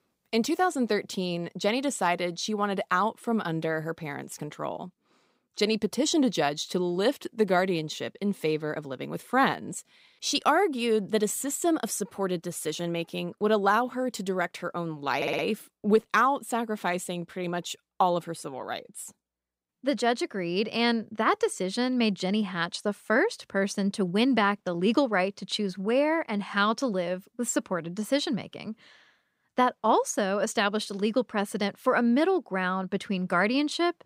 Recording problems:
audio stuttering; at 15 s

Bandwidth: 15.5 kHz